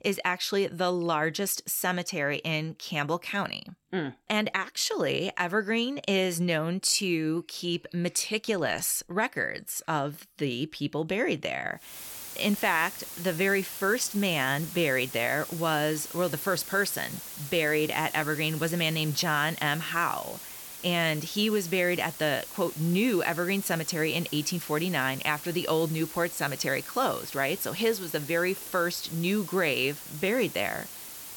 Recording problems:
hiss; noticeable; from 12 s on; 10 dB below the speech

